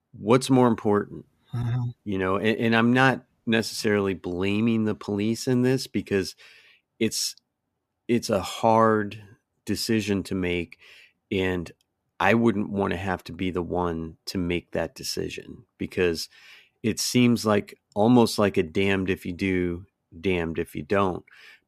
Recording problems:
none

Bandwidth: 14.5 kHz